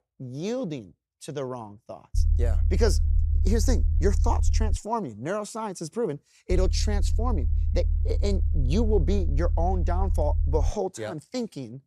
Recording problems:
low rumble; noticeable; from 2 to 5 s and from 6.5 to 11 s; 15 dB below the speech

